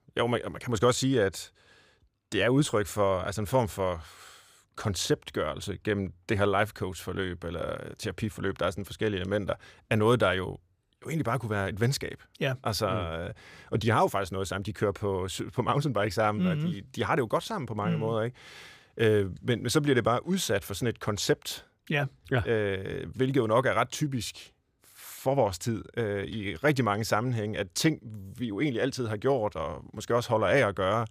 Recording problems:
none

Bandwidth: 15 kHz